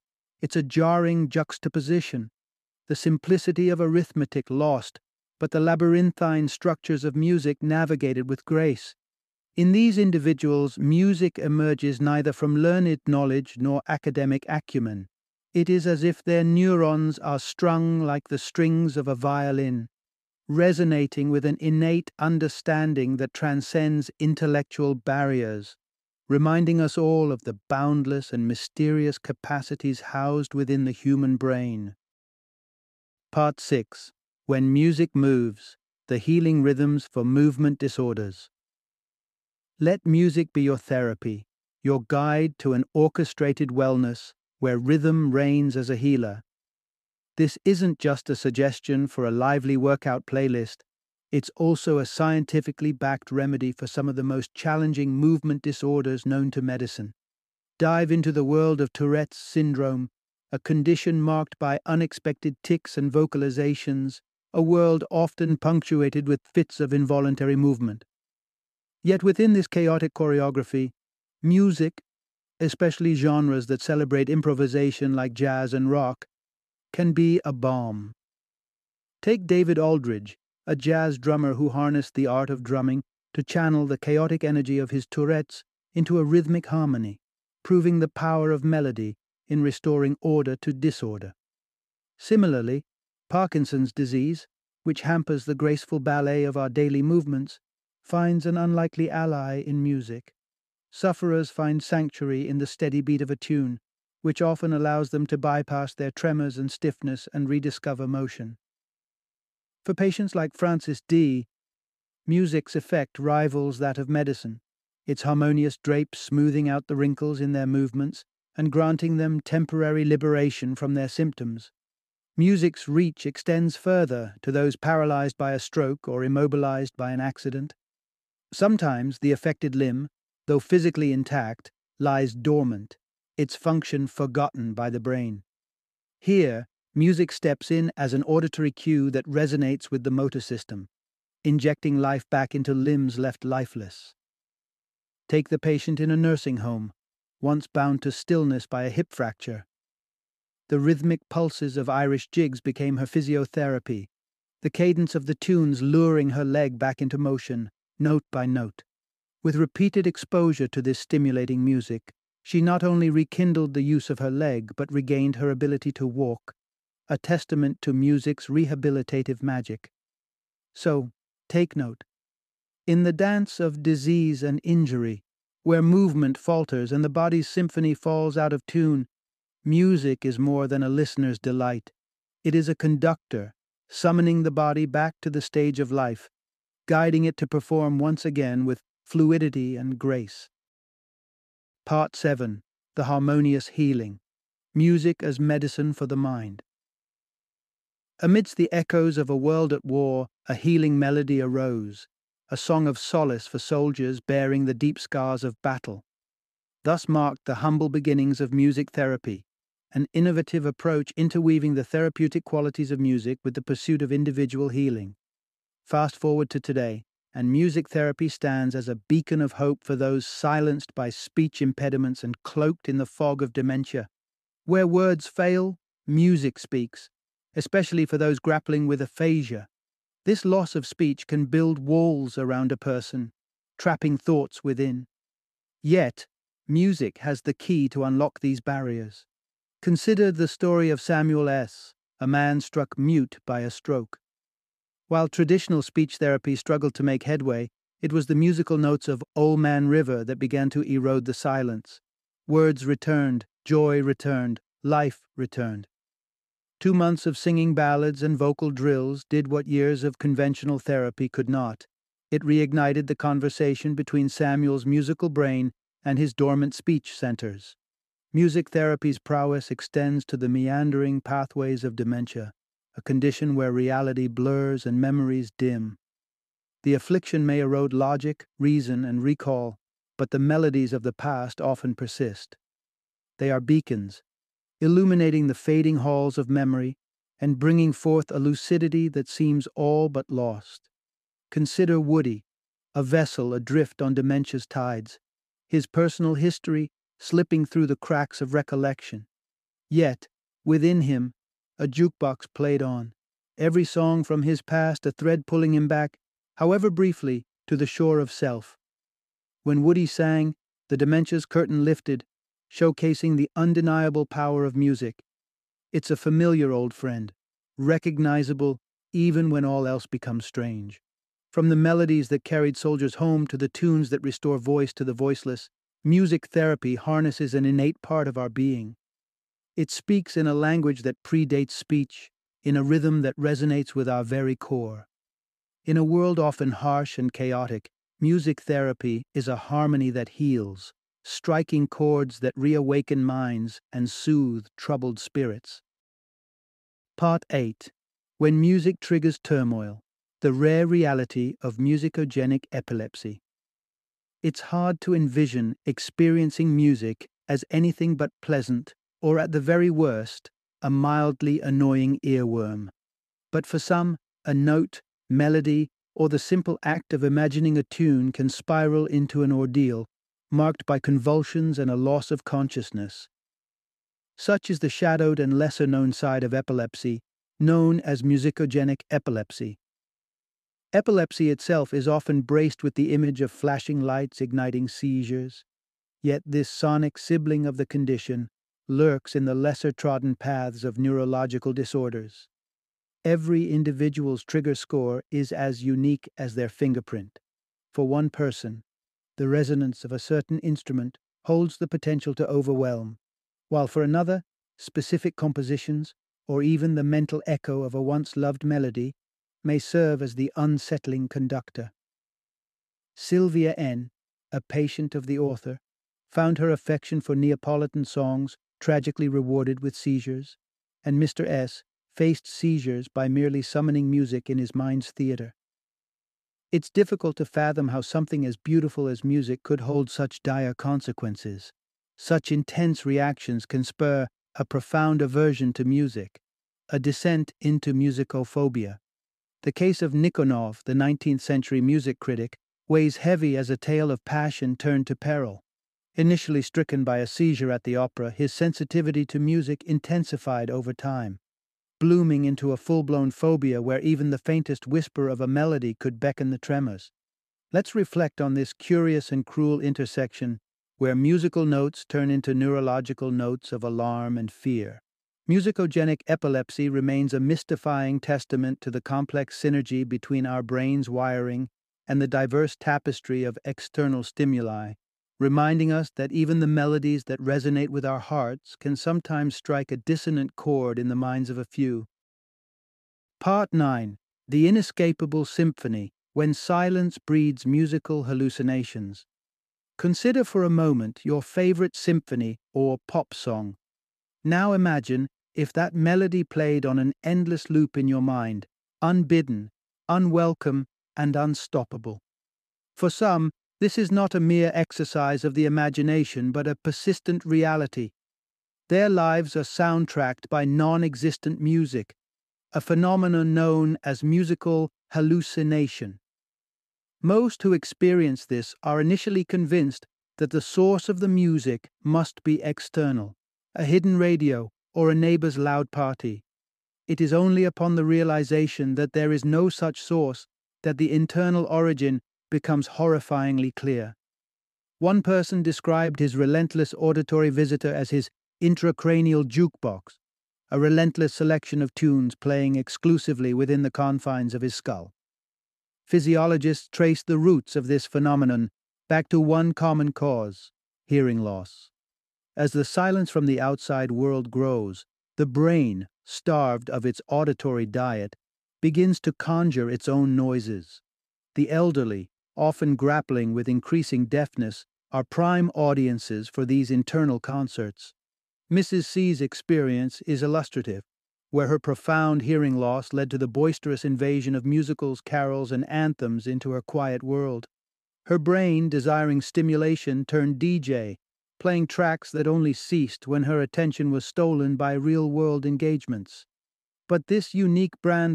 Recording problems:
abrupt cut into speech; at the end

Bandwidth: 14.5 kHz